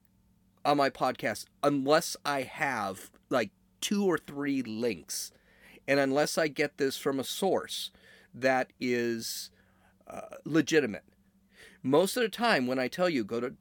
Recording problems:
none

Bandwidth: 17.5 kHz